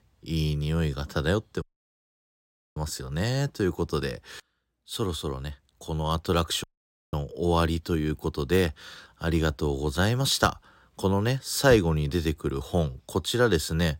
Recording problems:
audio cutting out; at 1.5 s for 1 s and at 6.5 s

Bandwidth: 16 kHz